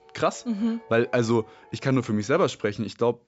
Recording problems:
high frequencies cut off; noticeable; nothing above 8 kHz
background music; faint; until 2.5 s; 25 dB below the speech

